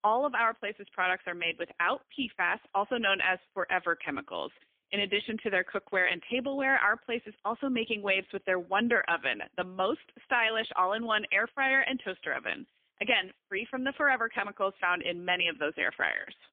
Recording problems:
phone-call audio; poor line; nothing above 3 kHz

